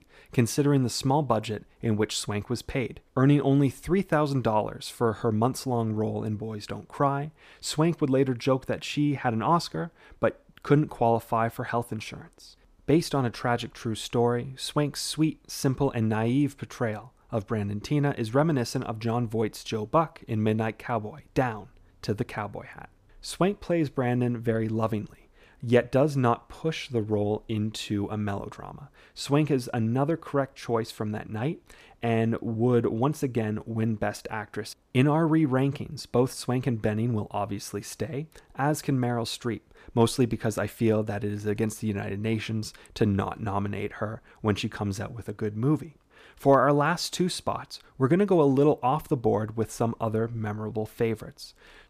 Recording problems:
none

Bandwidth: 15 kHz